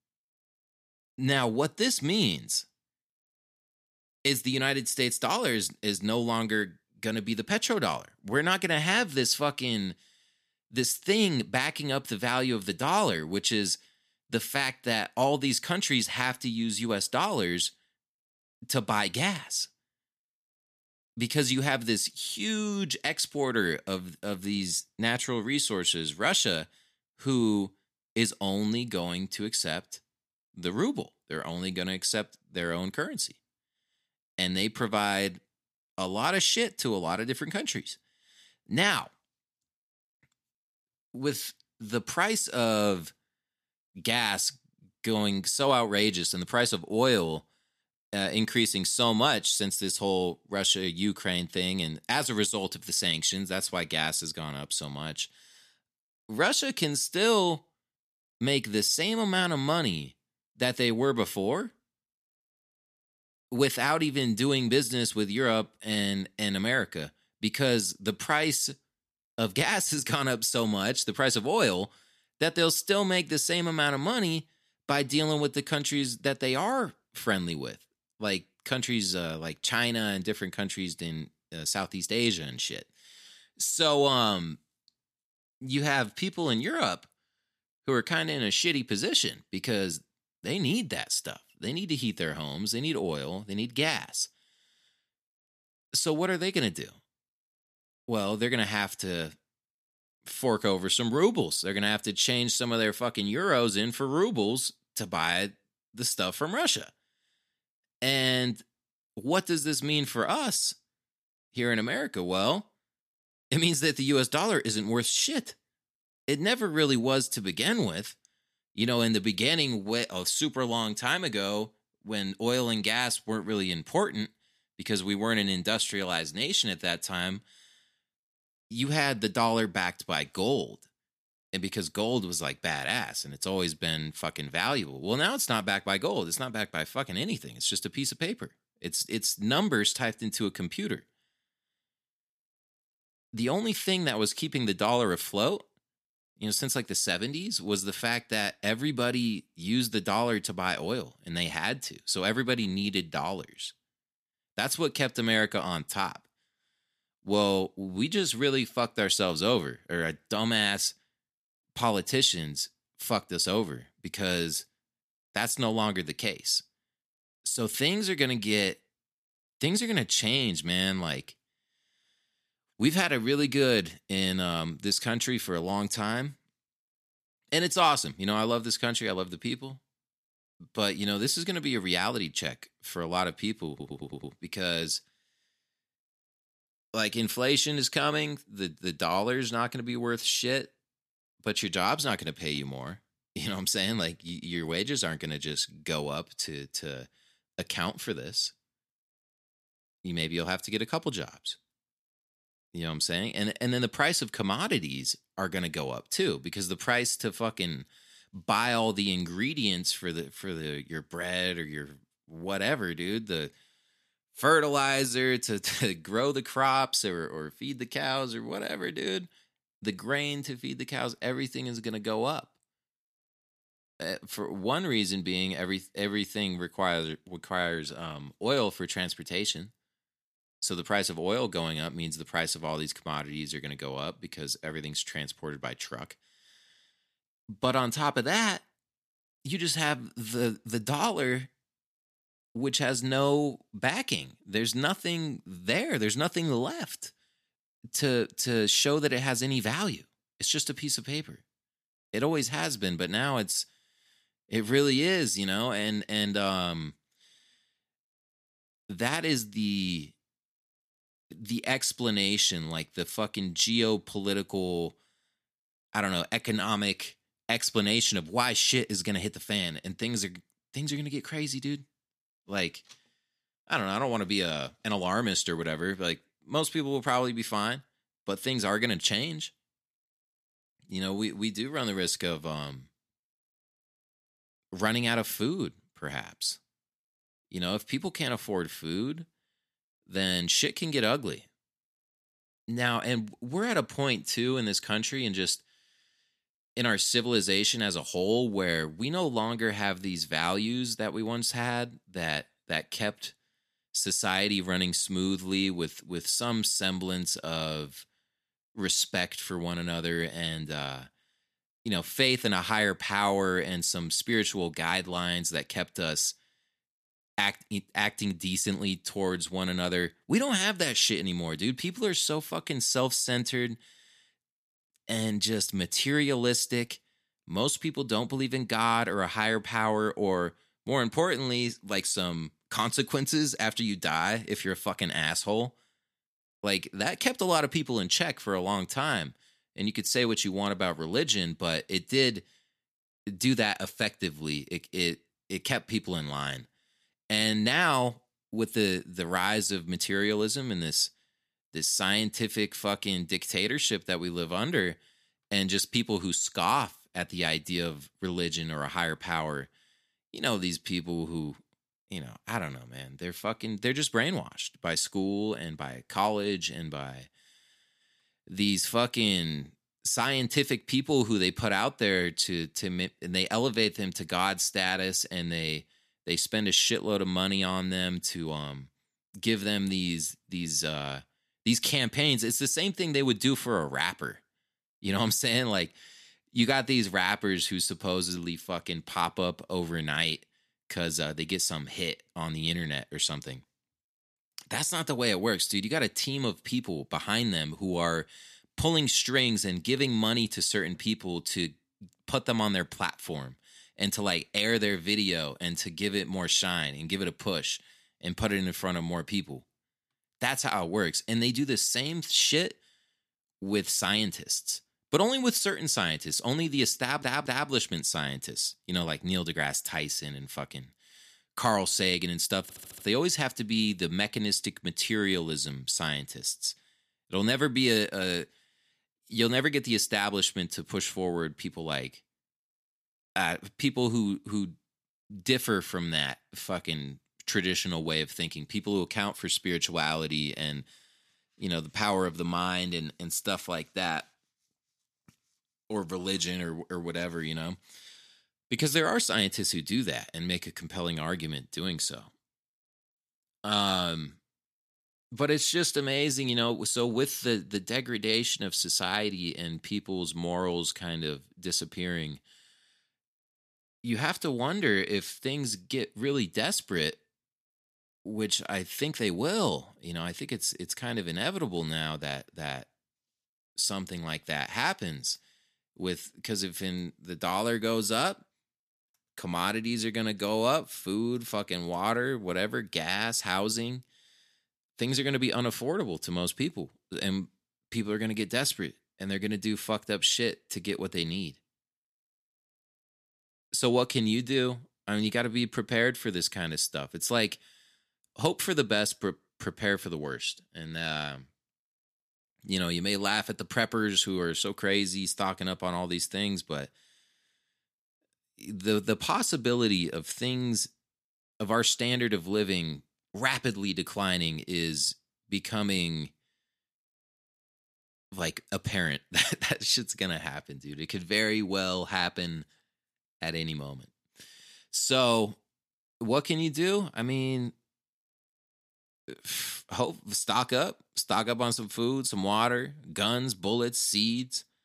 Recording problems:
audio stuttering; at 3:04, at 6:57 and at 7:03

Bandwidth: 14.5 kHz